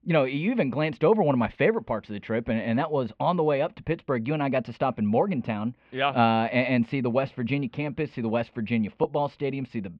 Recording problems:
muffled; slightly; fading above 3 kHz

